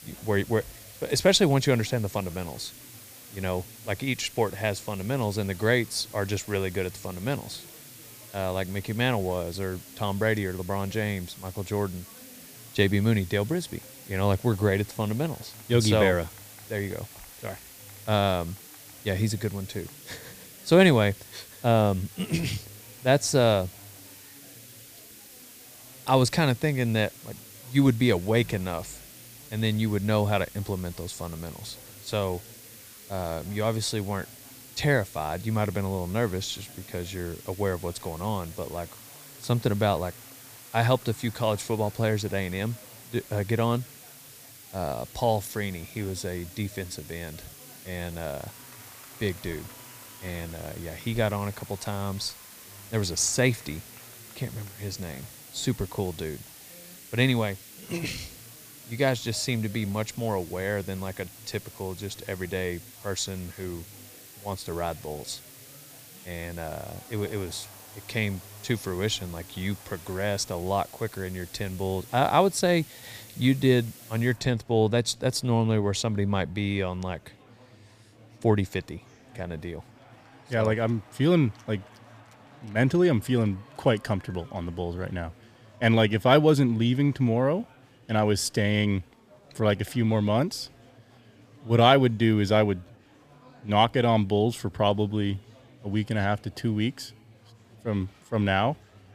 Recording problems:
hiss; noticeable; until 1:14; 20 dB below the speech
chatter from many people; faint; throughout; 25 dB below the speech

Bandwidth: 15 kHz